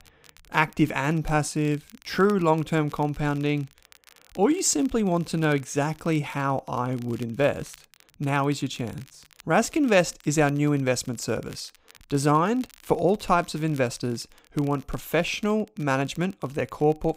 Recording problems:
crackle, like an old record; faint; 25 dB below the speech

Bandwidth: 15.5 kHz